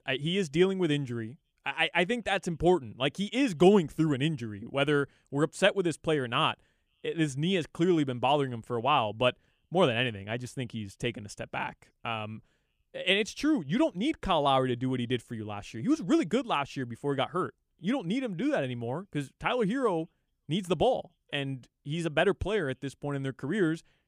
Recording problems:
none

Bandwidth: 15 kHz